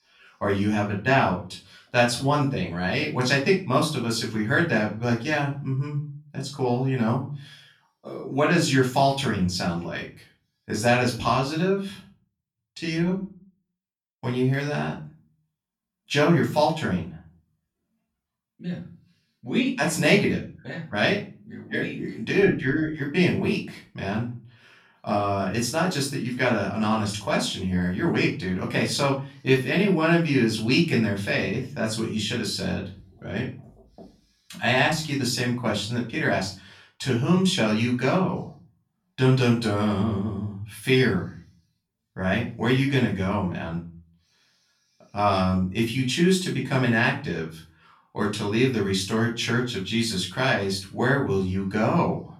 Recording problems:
off-mic speech; far
room echo; slight; dies away in 0.4 s

